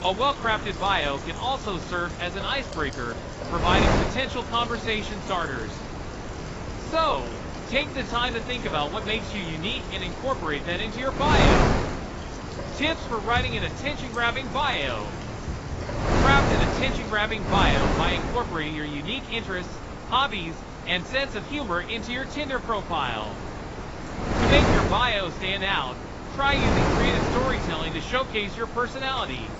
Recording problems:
garbled, watery; badly; nothing above 8 kHz
wind noise on the microphone; heavy; 5 dB below the speech
rain or running water; noticeable; throughout; 15 dB below the speech

